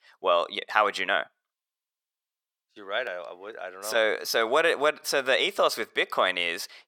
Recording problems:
thin; very; fading below 550 Hz

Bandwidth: 17 kHz